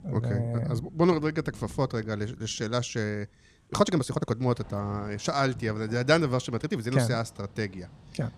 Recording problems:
rain or running water; noticeable; throughout; 20 dB below the speech
uneven, jittery; strongly; from 2.5 to 7 s

